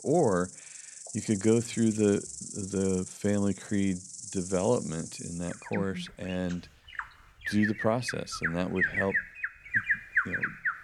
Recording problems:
animal sounds; loud; throughout; 4 dB below the speech

